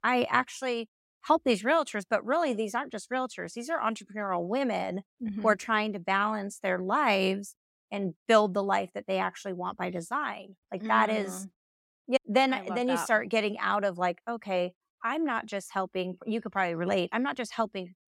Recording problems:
none

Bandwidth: 16 kHz